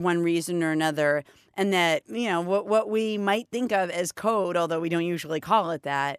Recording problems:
abrupt cut into speech; at the start

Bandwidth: 14.5 kHz